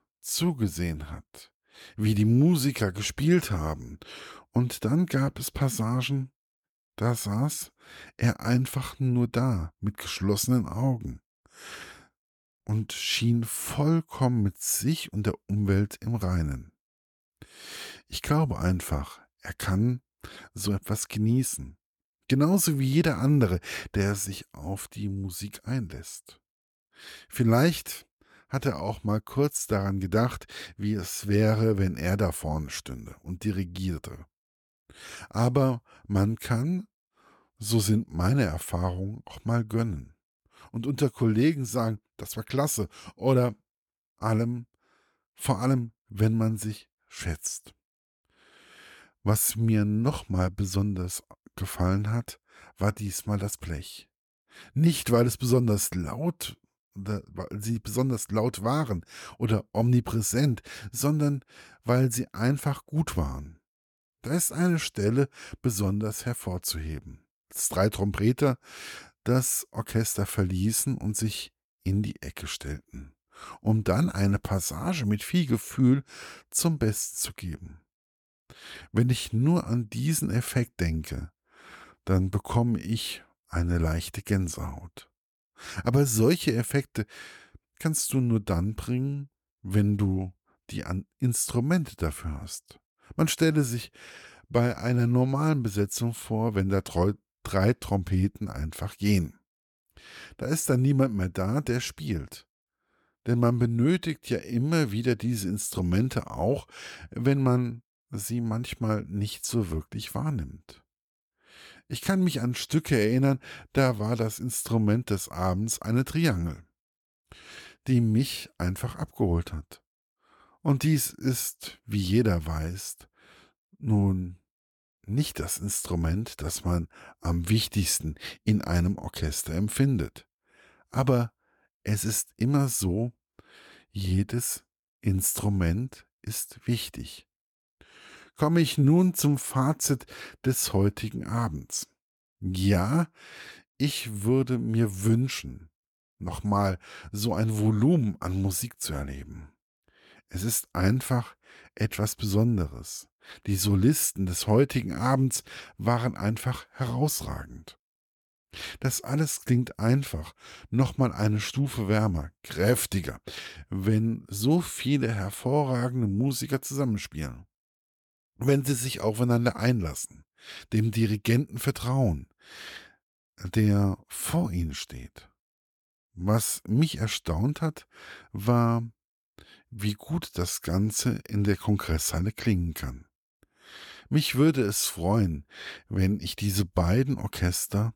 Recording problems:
none

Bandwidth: 18 kHz